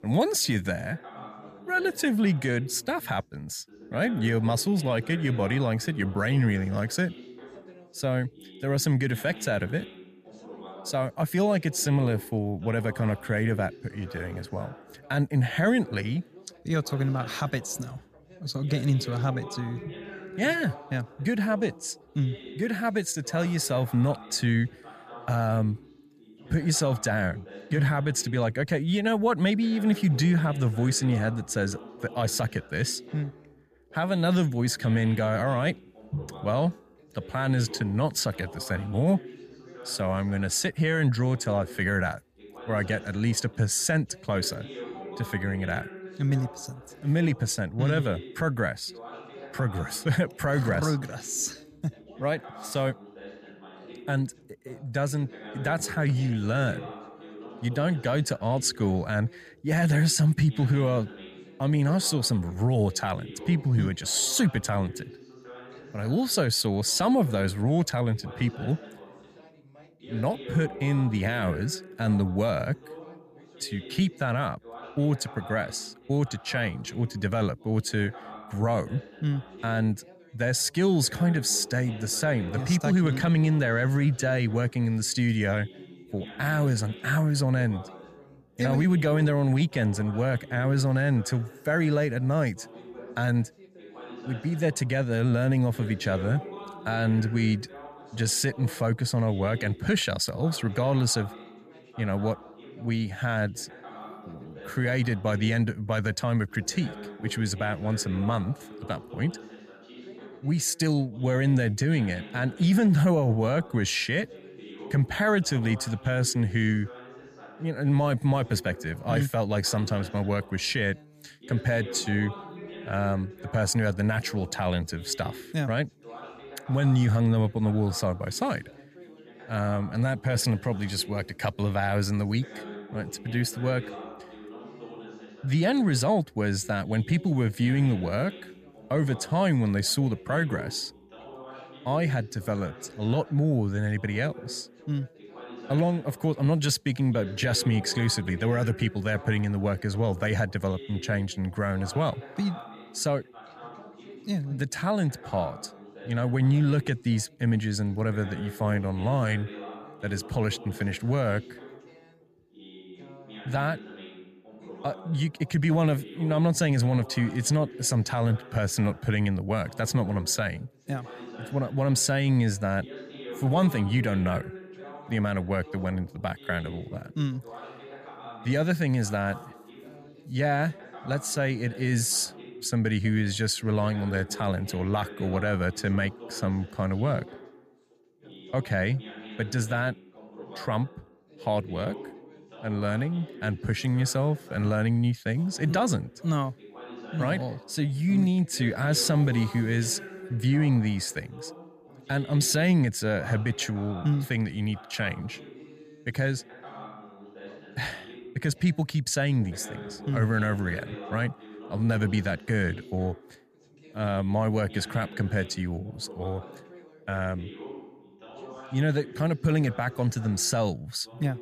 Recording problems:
background chatter; noticeable; throughout; 2 voices, 20 dB below the speech

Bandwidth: 14.5 kHz